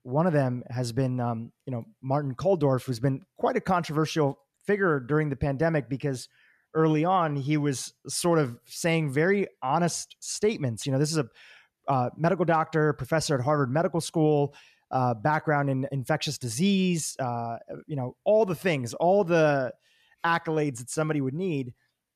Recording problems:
none

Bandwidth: 14.5 kHz